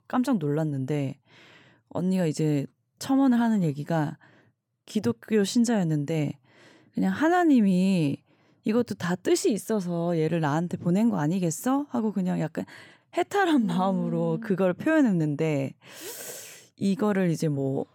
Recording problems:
none

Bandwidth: 17.5 kHz